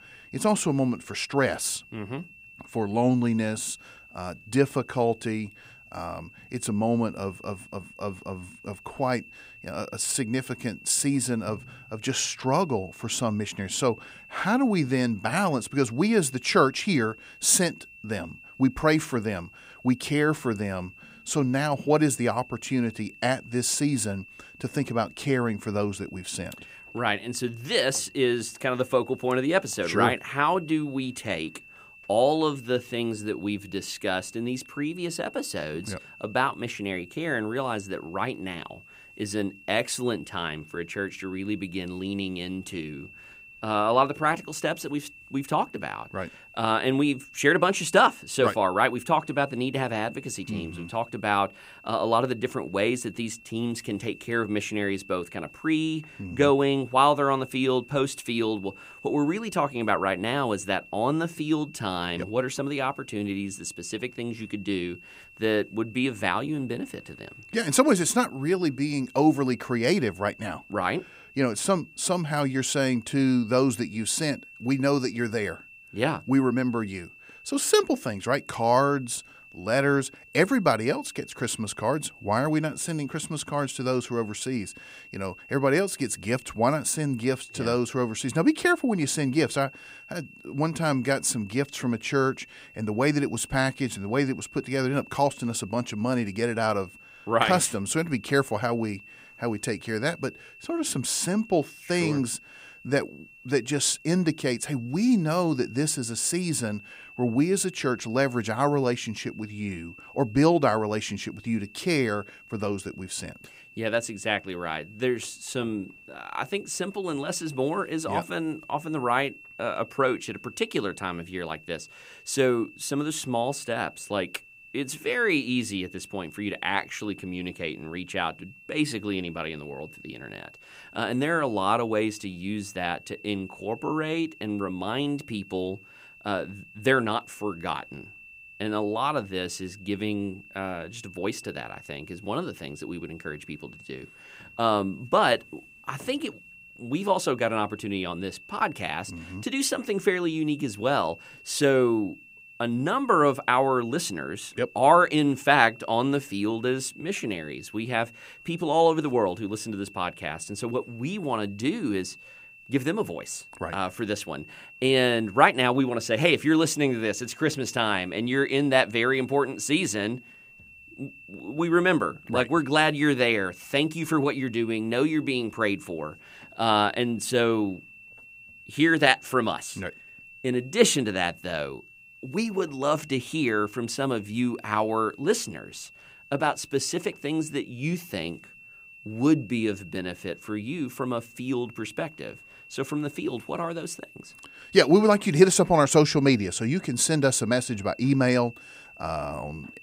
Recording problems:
high-pitched whine; faint; throughout; 2.5 kHz, 20 dB below the speech

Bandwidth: 15.5 kHz